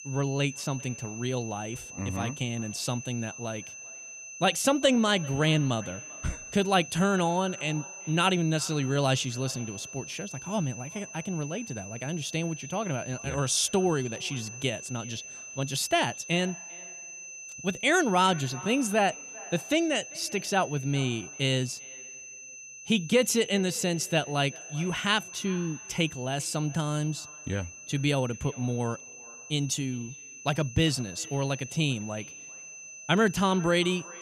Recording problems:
echo of what is said; faint; throughout; 390 ms later, 25 dB below the speech
high-pitched whine; noticeable; throughout; 6 kHz, 10 dB below the speech

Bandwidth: 14.5 kHz